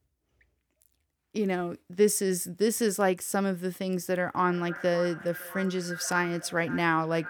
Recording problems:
echo of what is said; noticeable; from 4.5 s on; 560 ms later, 15 dB below the speech

